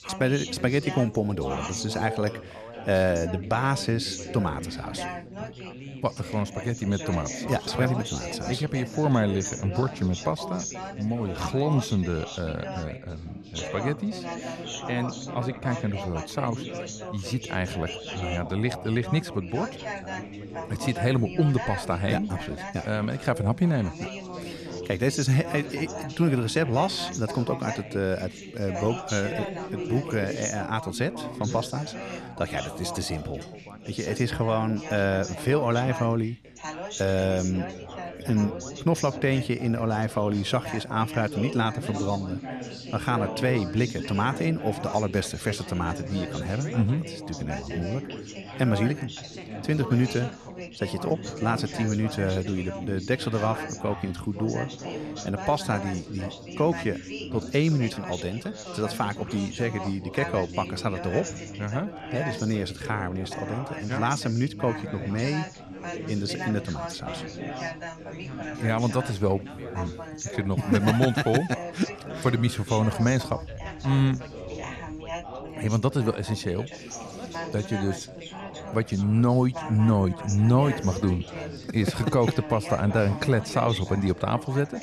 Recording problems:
background chatter; loud; throughout; 4 voices, 9 dB below the speech

